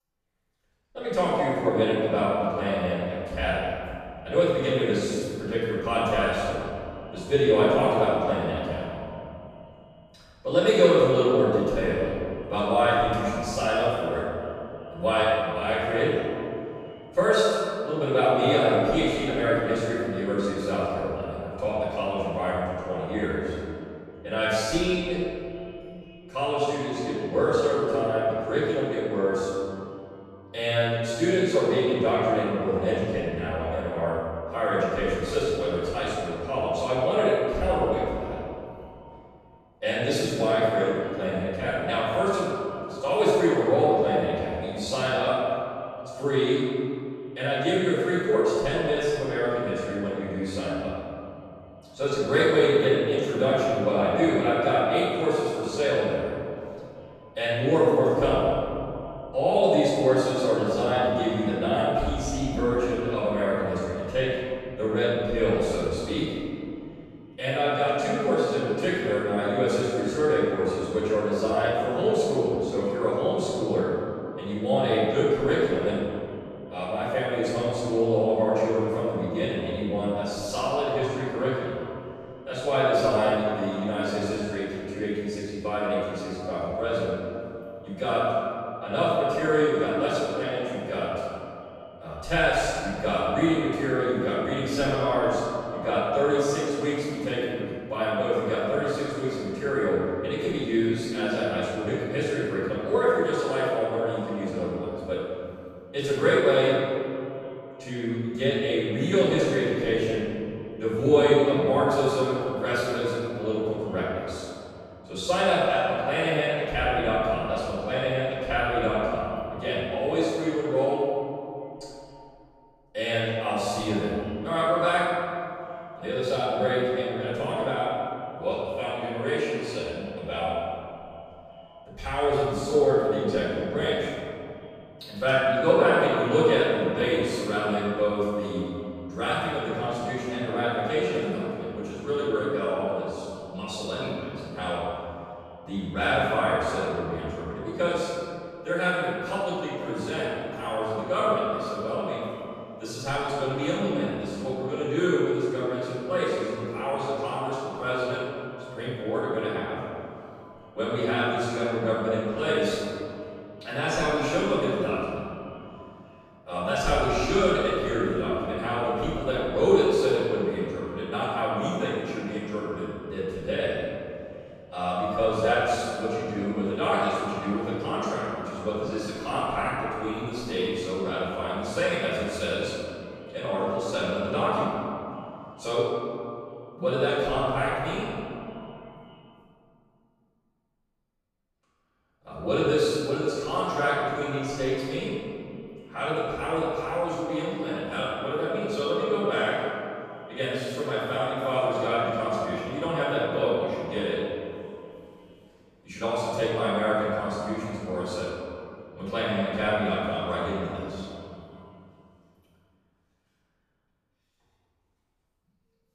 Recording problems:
room echo; strong; dies away in 2.6 s
off-mic speech; far
echo of what is said; faint; throughout; 380 ms later, 20 dB below the speech

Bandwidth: 14.5 kHz